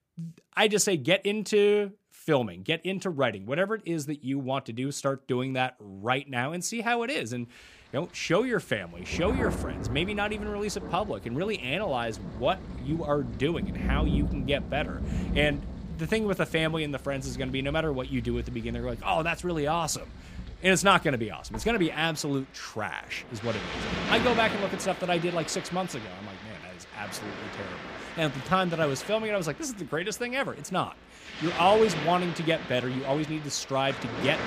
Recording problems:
rain or running water; loud; from 7.5 s on; 8 dB below the speech

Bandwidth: 15 kHz